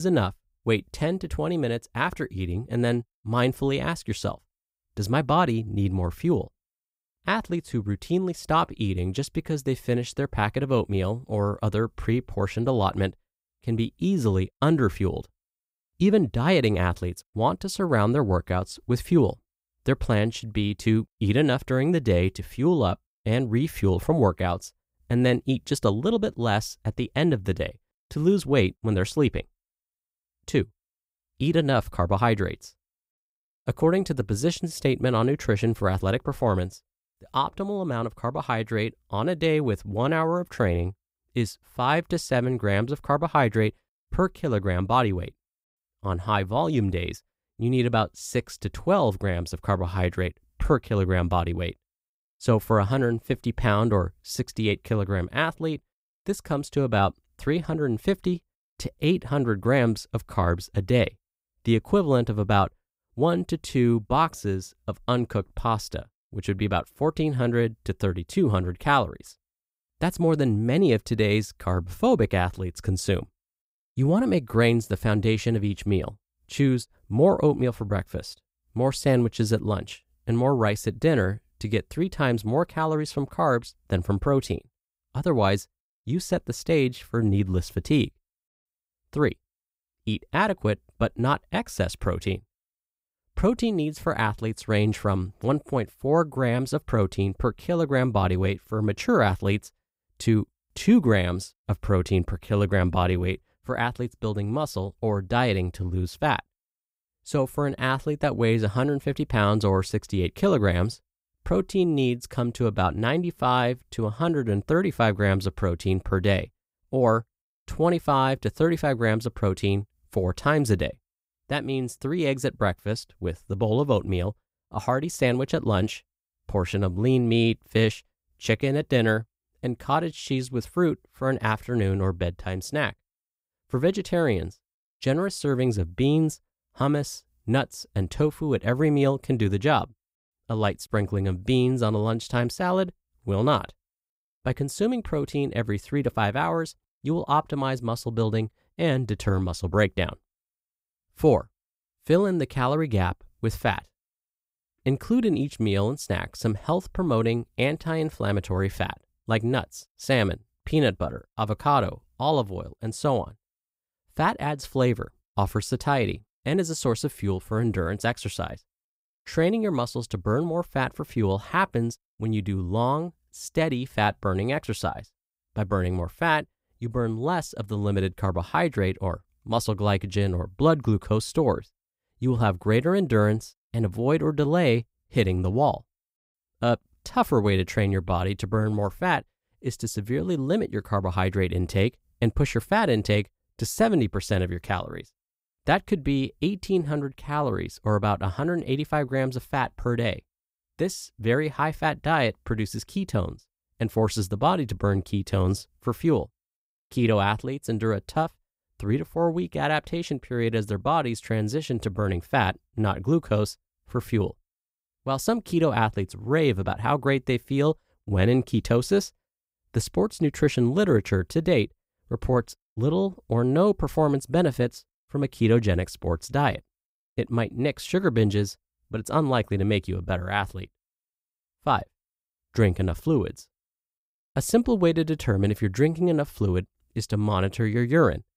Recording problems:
abrupt cut into speech; at the start

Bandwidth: 15.5 kHz